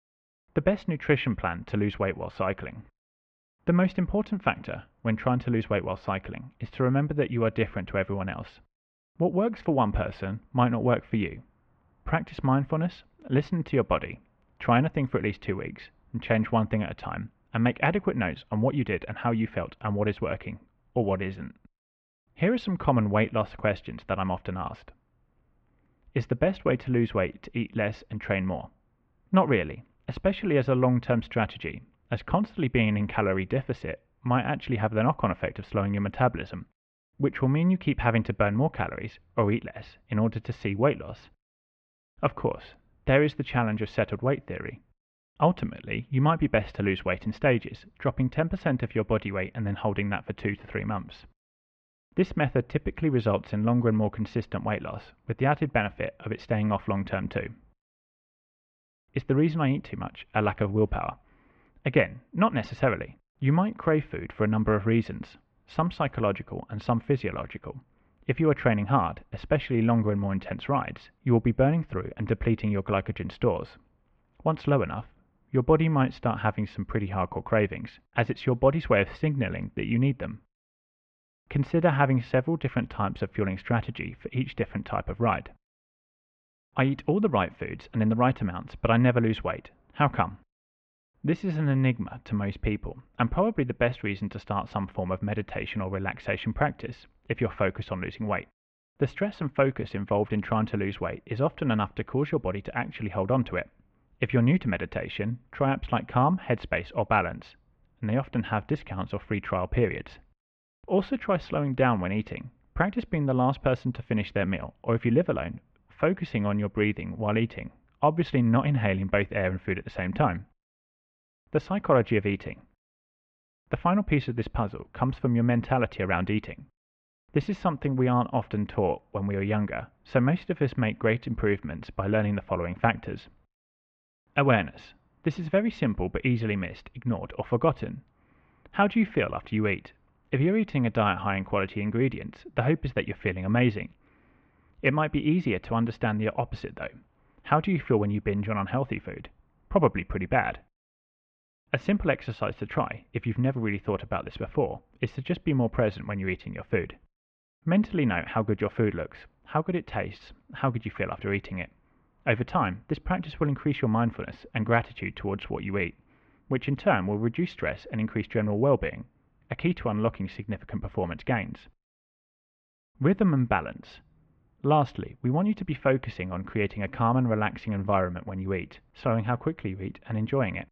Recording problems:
muffled; very; fading above 2.5 kHz

